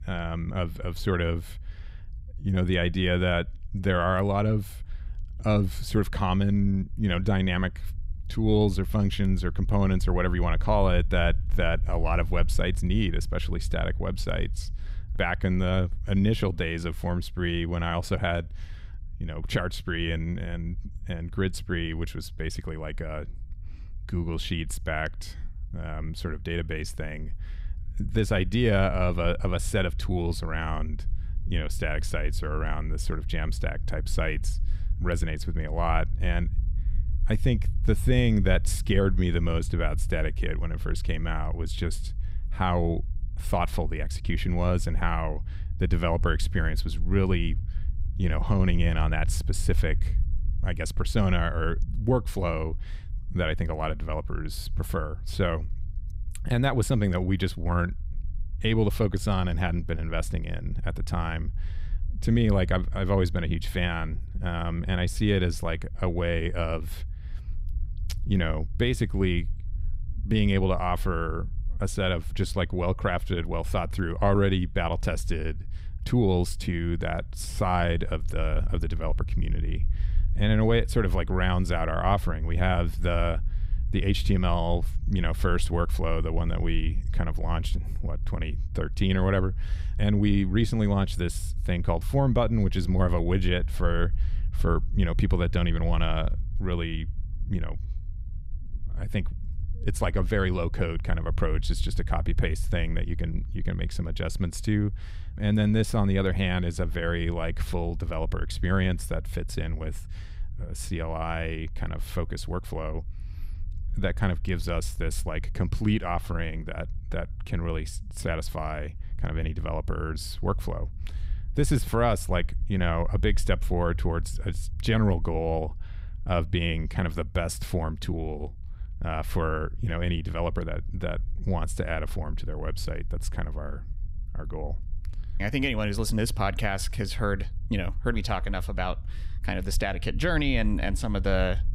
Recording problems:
low rumble; faint; throughout; 25 dB below the speech

